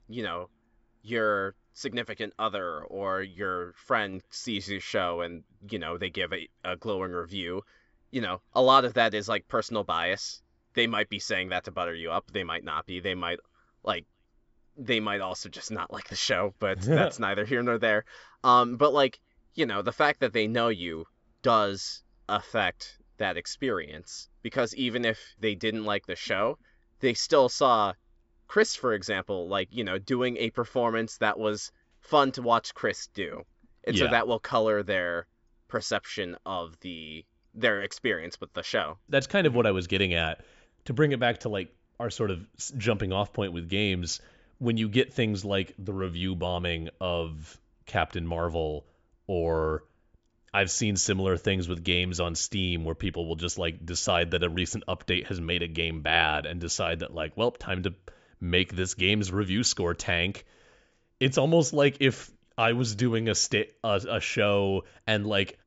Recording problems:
high frequencies cut off; noticeable; nothing above 8 kHz

